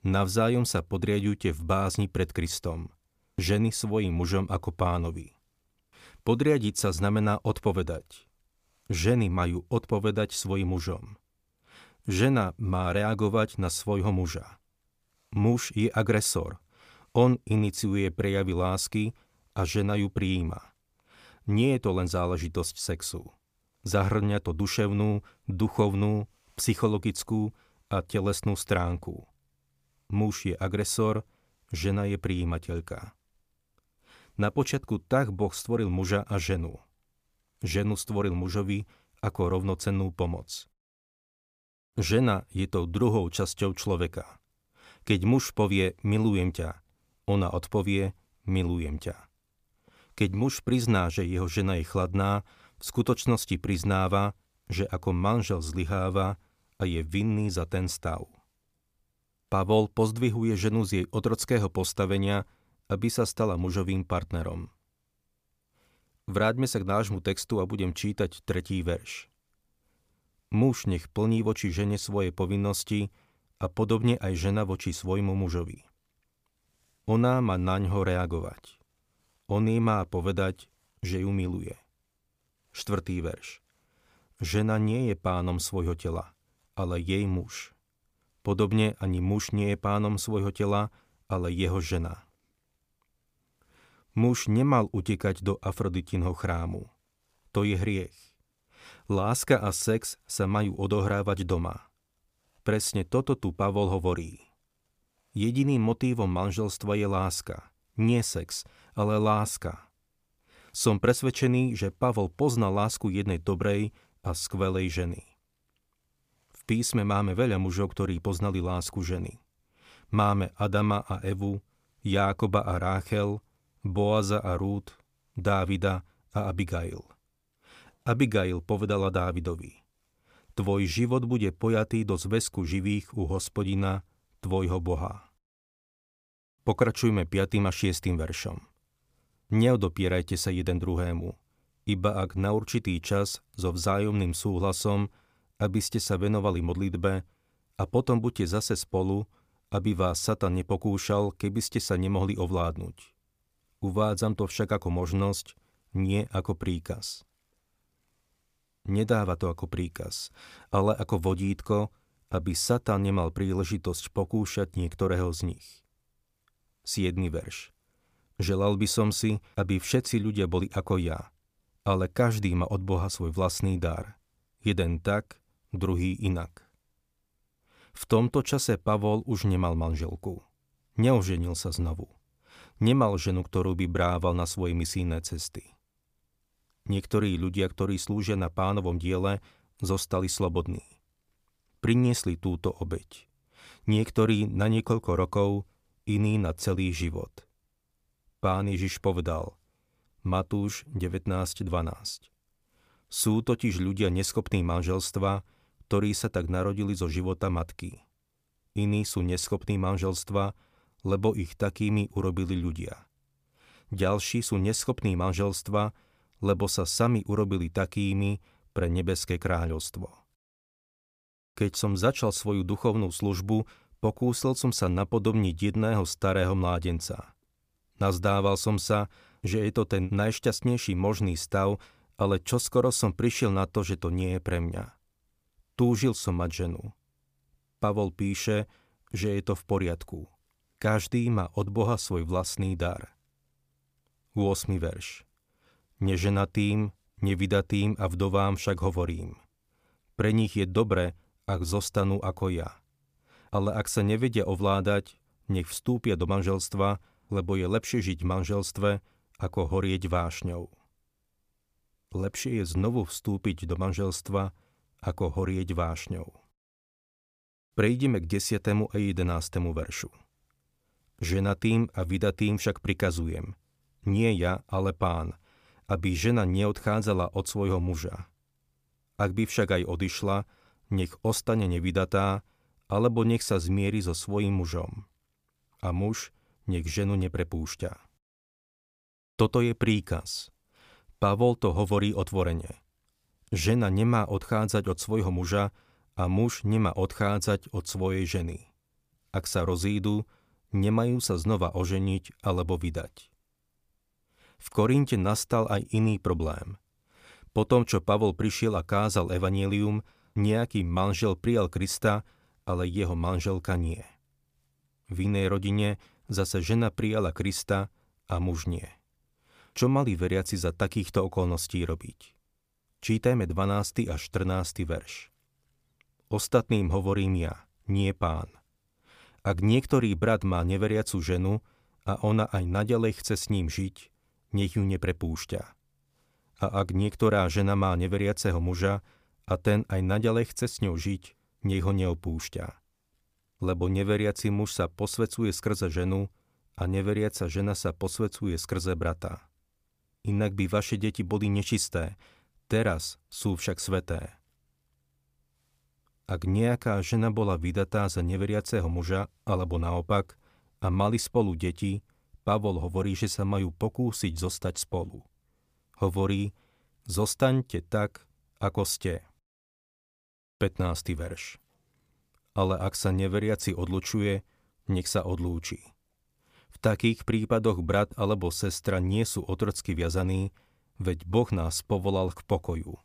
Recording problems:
none

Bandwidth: 15 kHz